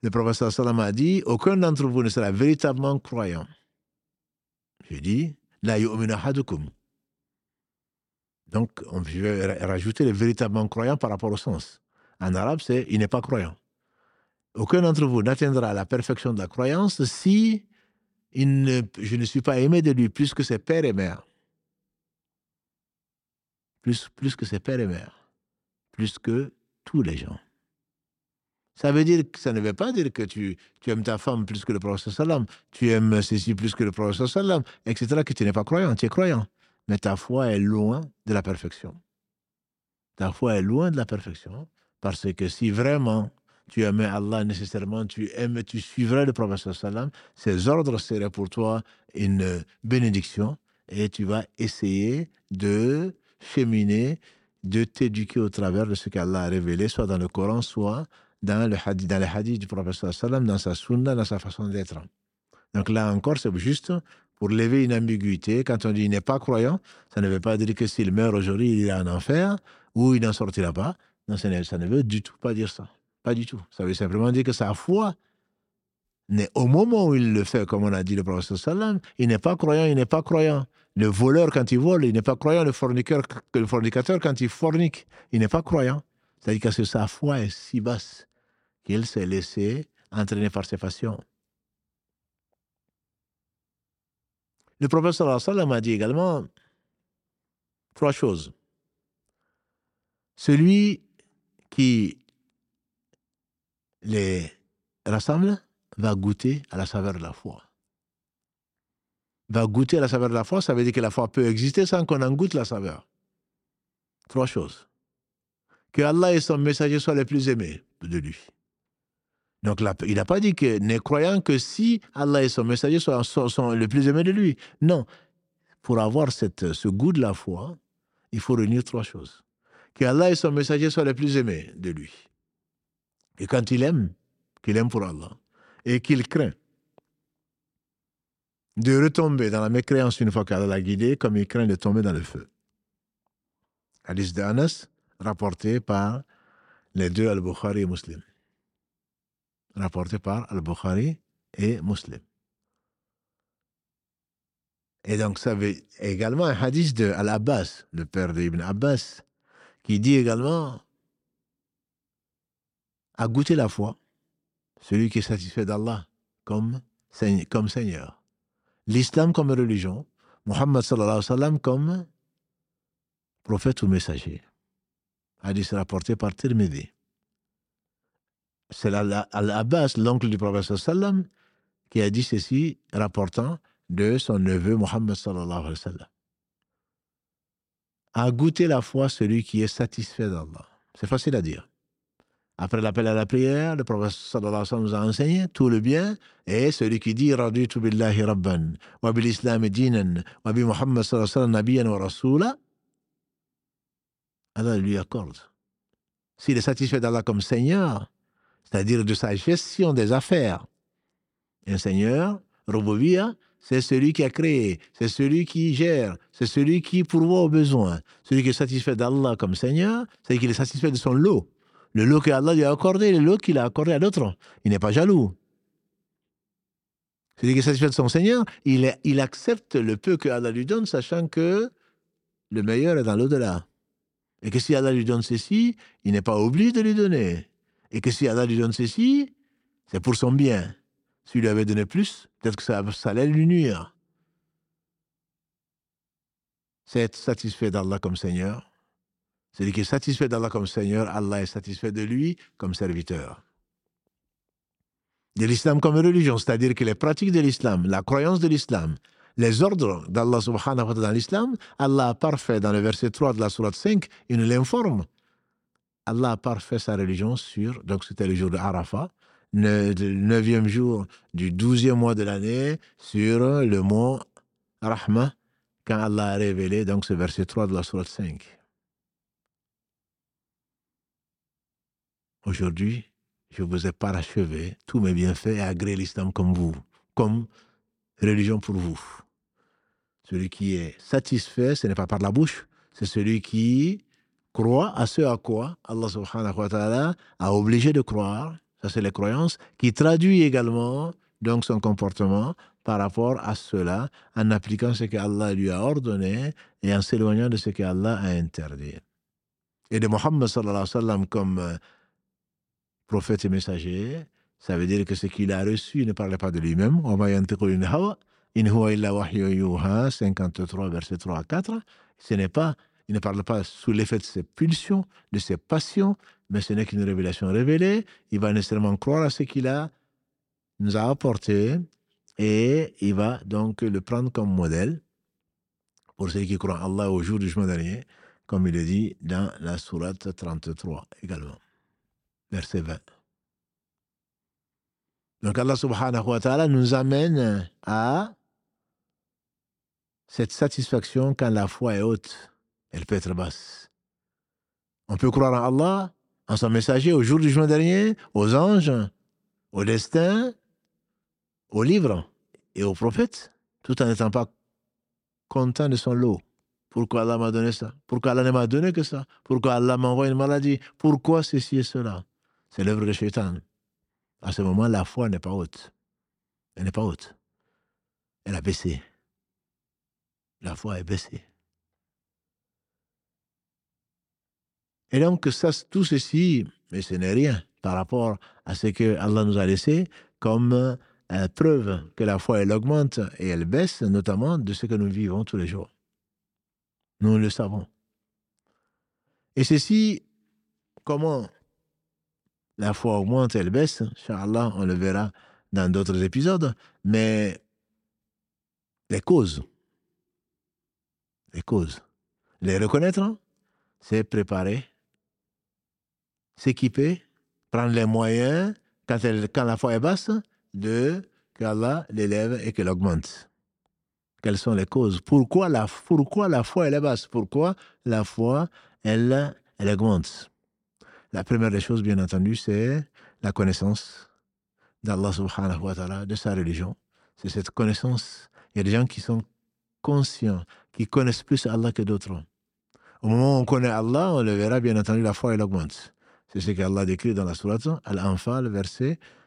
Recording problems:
none

